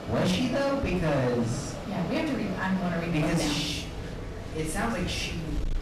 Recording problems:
off-mic speech; far
room echo; noticeable; dies away in 0.5 s
distortion; slight; 12% of the sound clipped
machinery noise; loud; throughout; 9 dB below the speech

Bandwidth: 14 kHz